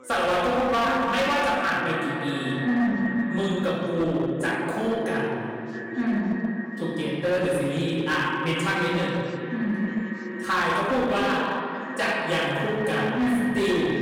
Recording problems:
echo of what is said; strong; throughout; 420 ms later, 10 dB below the speech
room echo; strong; dies away in 2.1 s
off-mic speech; far
distortion; slight; 13% of the sound clipped
background chatter; faint; throughout; 2 voices, 25 dB below the speech

